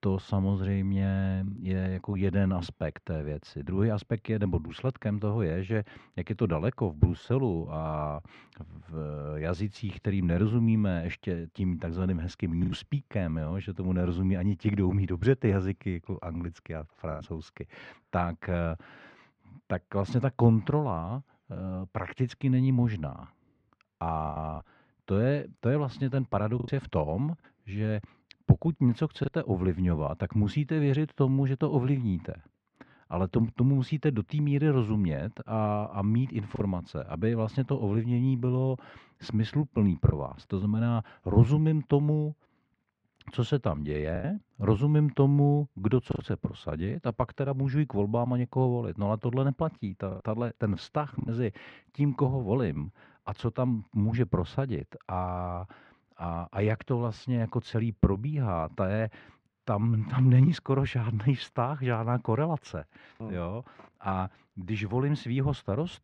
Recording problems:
muffled; very; fading above 2 kHz
choppy; occasionally; 2% of the speech affected

